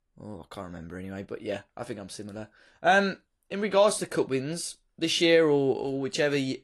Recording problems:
garbled, watery; slightly

